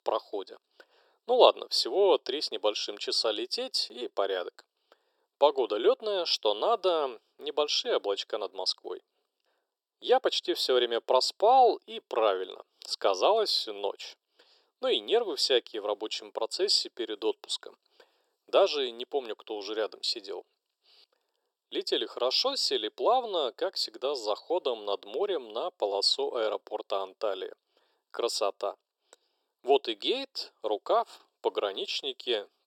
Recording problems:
thin; very; fading below 350 Hz

